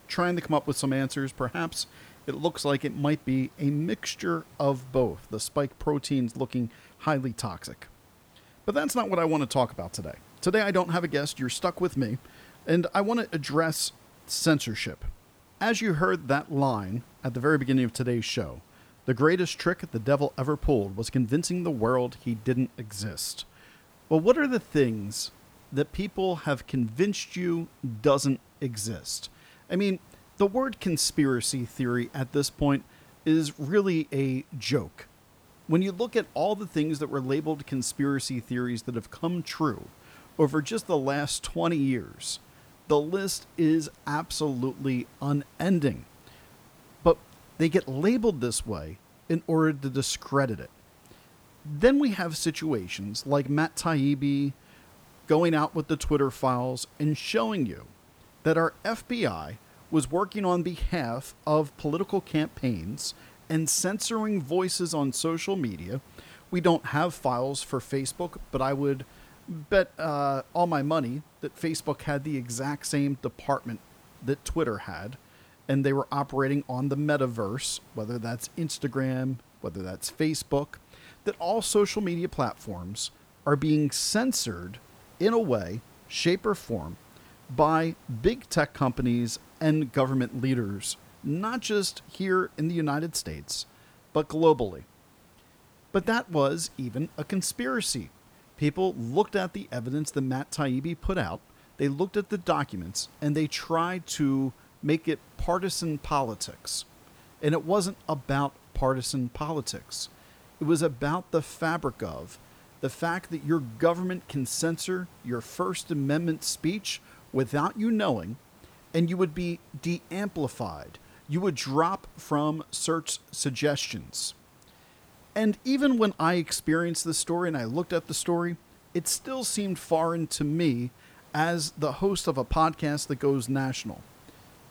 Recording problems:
hiss; faint; throughout; 25 dB below the speech

